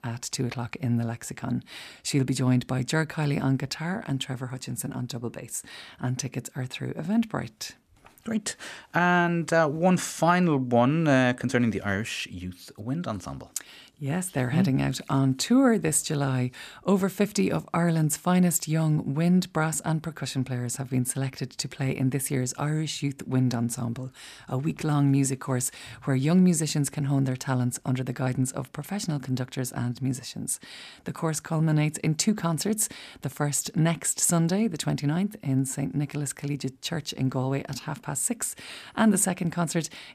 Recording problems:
none

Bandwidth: 14.5 kHz